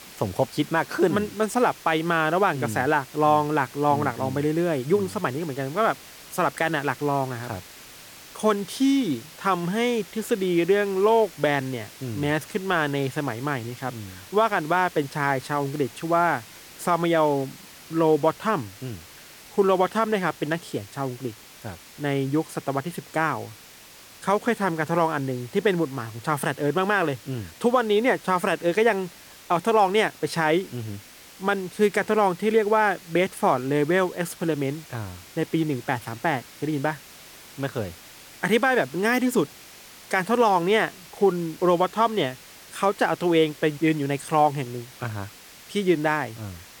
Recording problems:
hiss; noticeable; throughout; 20 dB below the speech

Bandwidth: 18 kHz